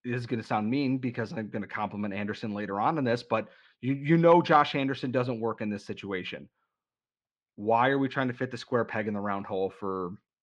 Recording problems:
muffled; very slightly; fading above 4 kHz

